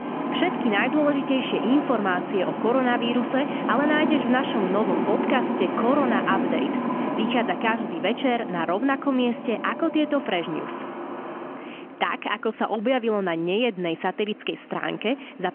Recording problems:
phone-call audio; nothing above 3 kHz
traffic noise; loud; throughout; 4 dB below the speech

